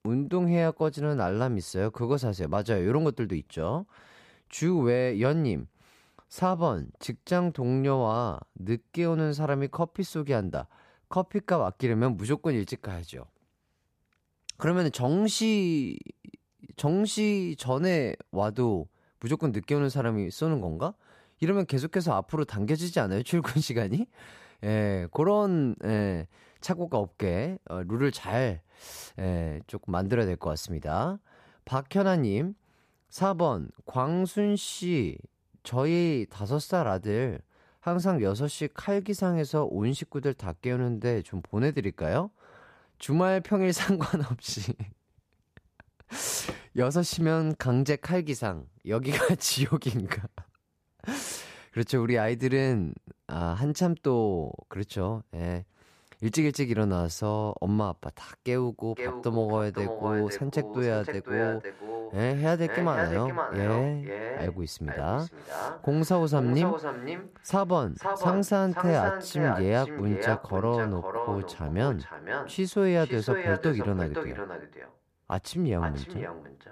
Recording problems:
echo of what is said; strong; from 59 s on; 510 ms later, 6 dB below the speech

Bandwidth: 14.5 kHz